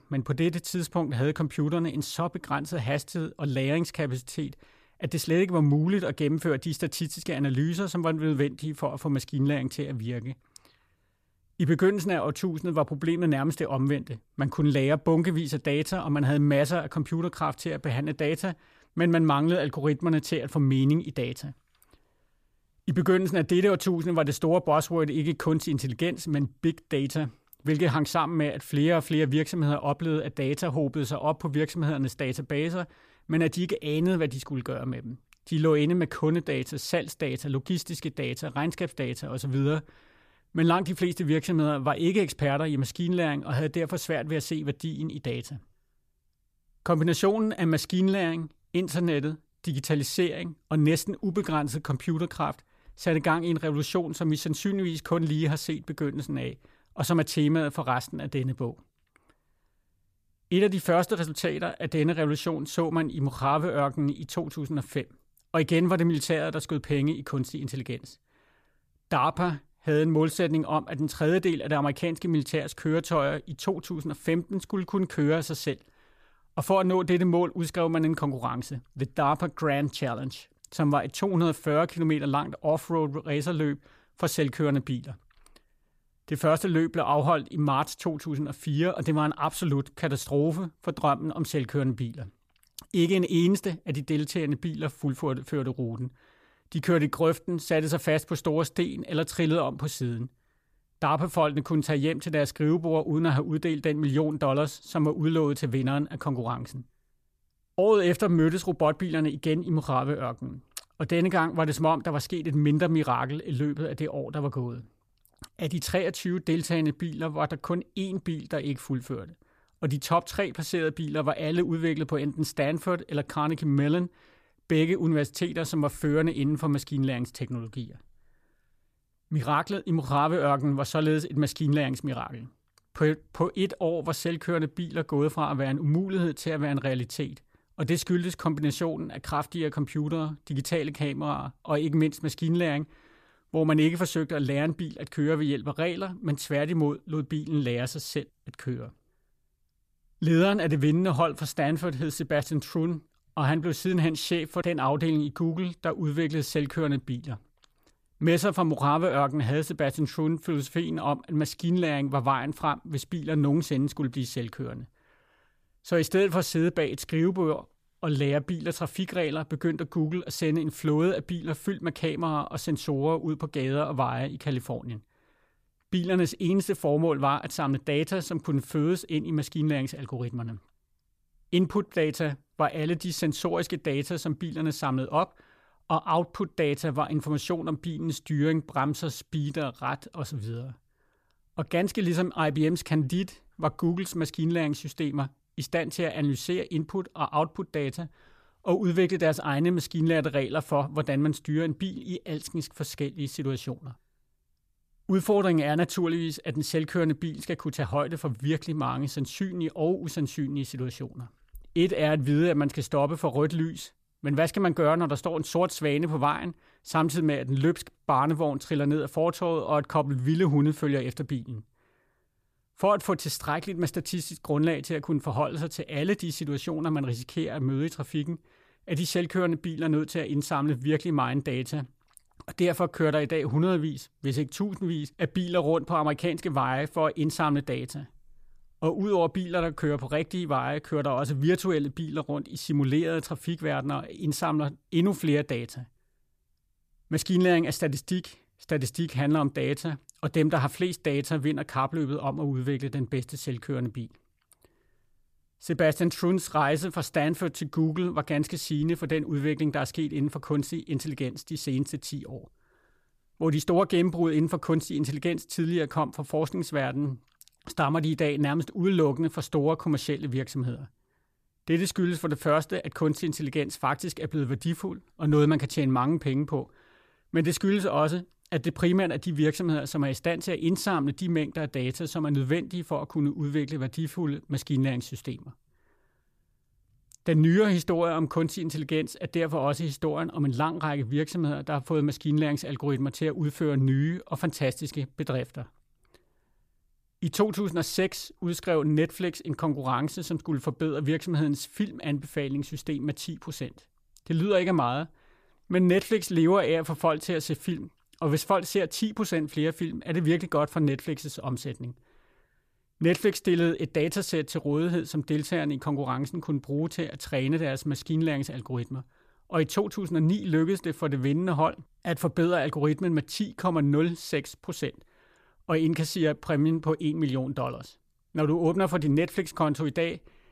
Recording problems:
none

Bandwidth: 14.5 kHz